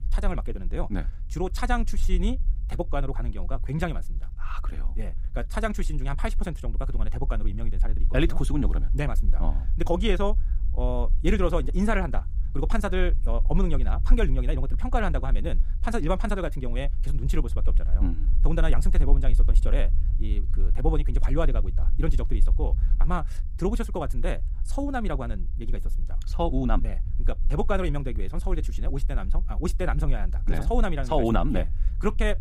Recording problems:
wrong speed, natural pitch; too fast; 1.6 times normal speed
low rumble; noticeable; throughout; 20 dB below the speech

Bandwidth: 15.5 kHz